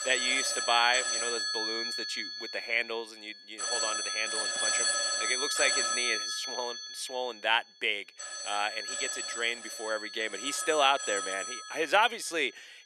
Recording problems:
thin; somewhat; fading below 300 Hz
alarms or sirens; loud; throughout; as loud as the speech

